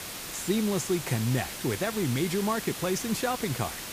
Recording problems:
hiss; loud; throughout; 6 dB below the speech

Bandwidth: 15 kHz